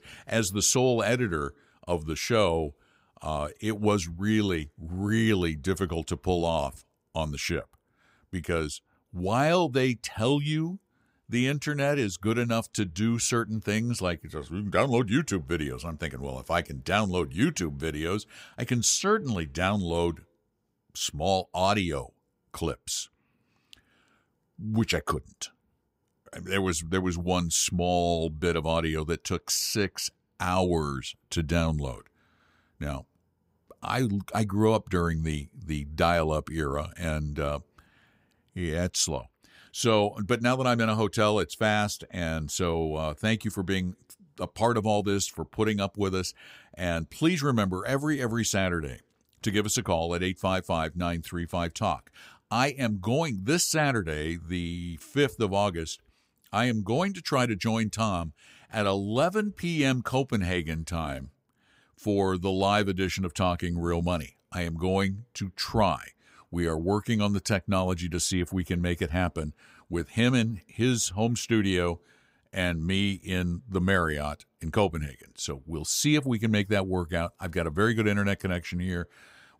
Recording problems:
none

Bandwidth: 15.5 kHz